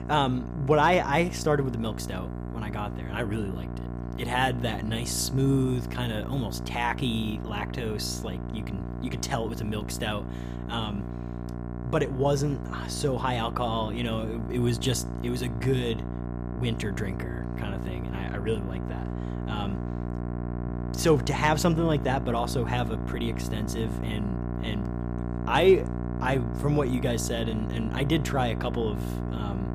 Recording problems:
electrical hum; noticeable; throughout; 60 Hz, 10 dB below the speech

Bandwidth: 15 kHz